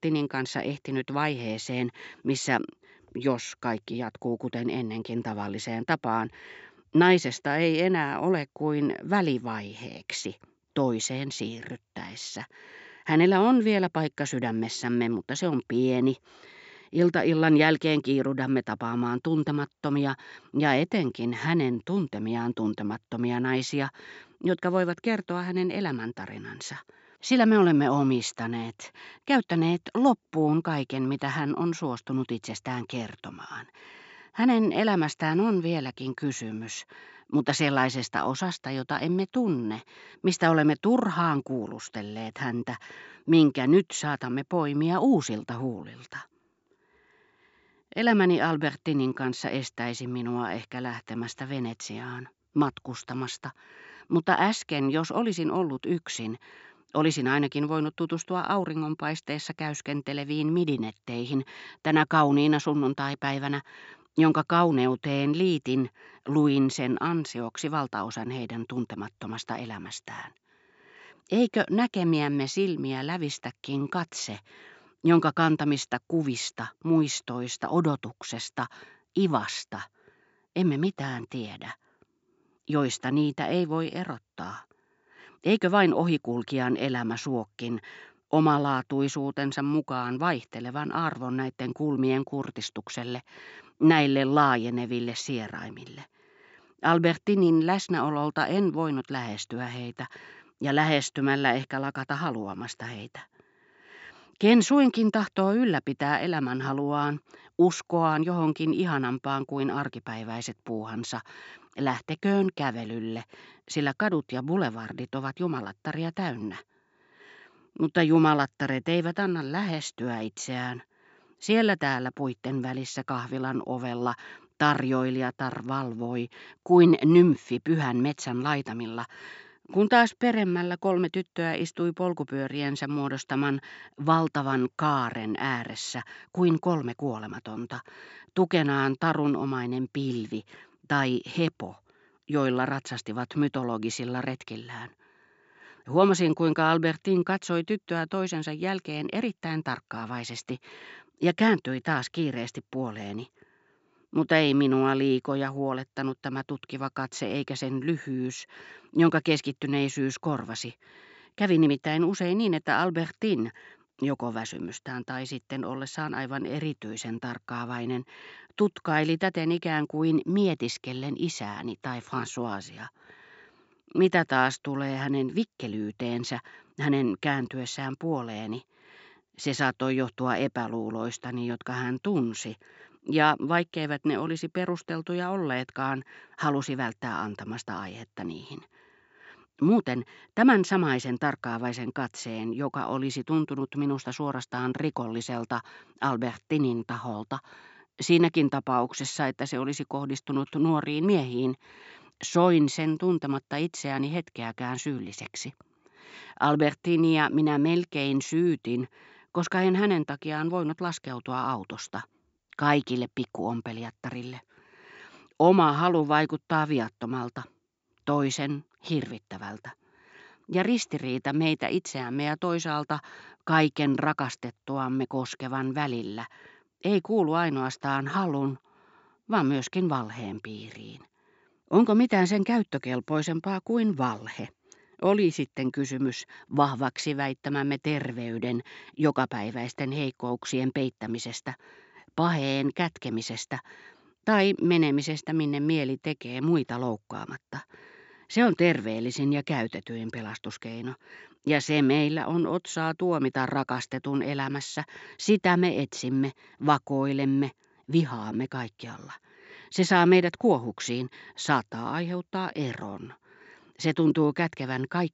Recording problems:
high frequencies cut off; noticeable; nothing above 8 kHz

